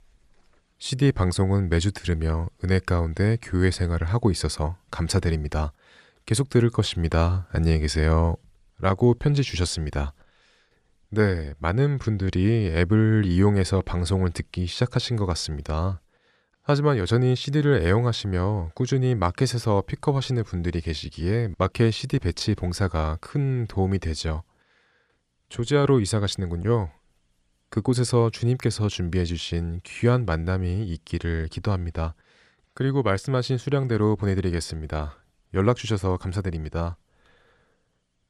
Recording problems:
none

